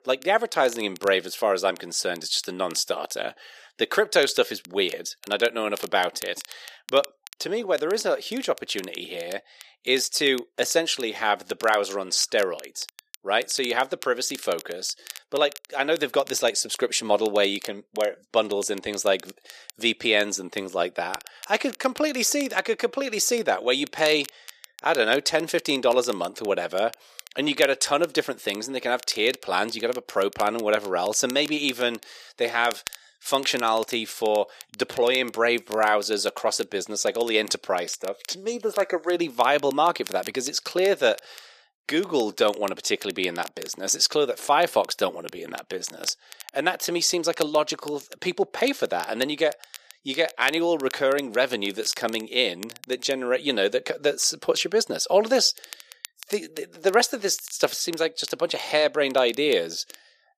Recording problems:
thin; somewhat; fading below 450 Hz
crackle, like an old record; noticeable; 20 dB below the speech

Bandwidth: 14.5 kHz